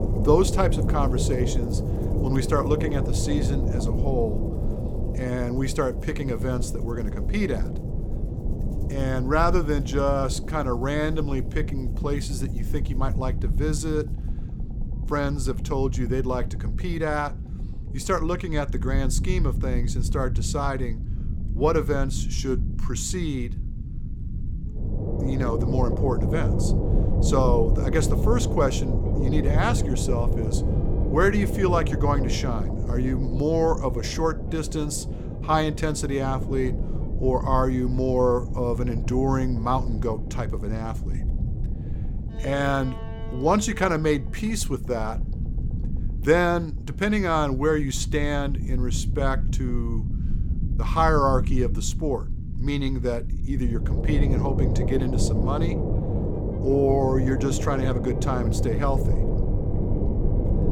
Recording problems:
low rumble; loud; throughout; 10 dB below the speech
background music; faint; throughout; 30 dB below the speech

